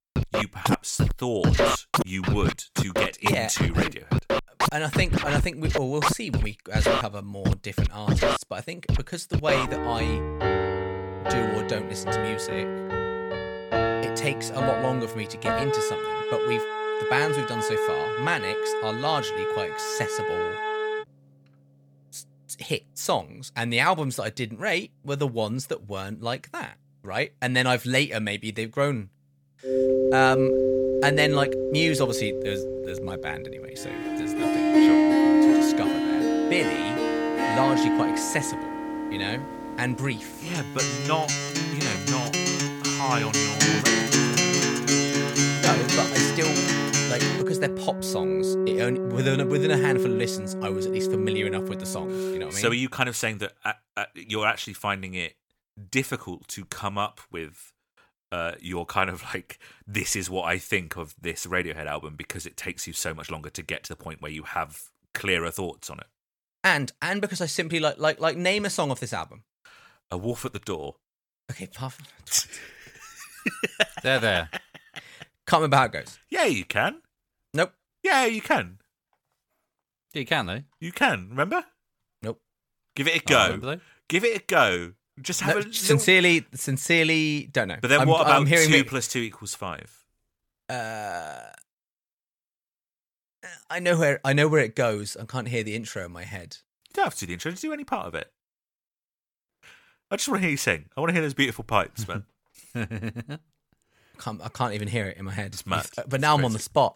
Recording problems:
background music; very loud; until 52 s; 1 dB above the speech

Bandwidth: 18 kHz